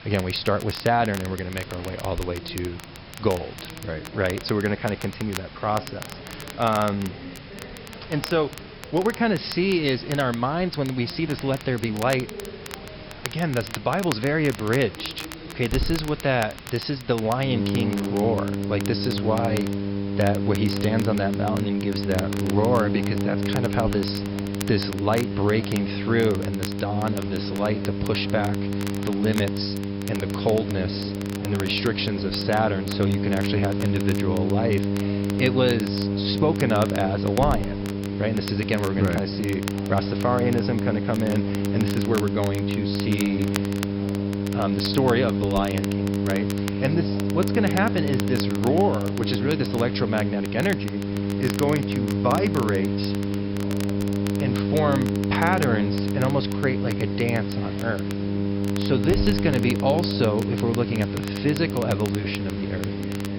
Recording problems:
high frequencies cut off; noticeable; nothing above 5.5 kHz
electrical hum; loud; from 17 s on; 50 Hz, 6 dB below the speech
voice in the background; noticeable; throughout; 20 dB below the speech
hiss; noticeable; throughout; 15 dB below the speech
crackle, like an old record; noticeable; 15 dB below the speech

